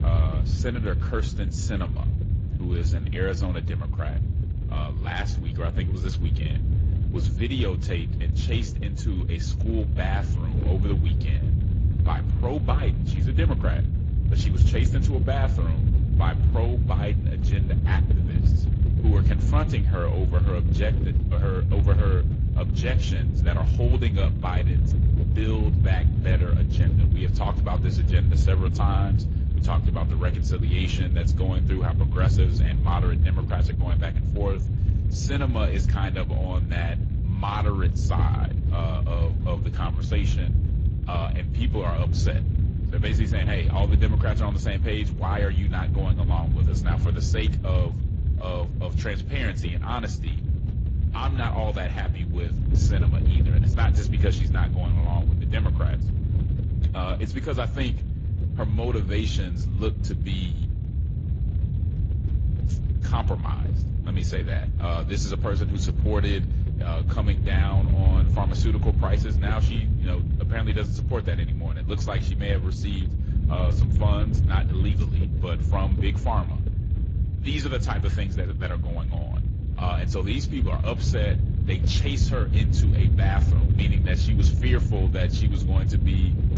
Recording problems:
garbled, watery; slightly; nothing above 7.5 kHz
low rumble; loud; throughout; 5 dB below the speech

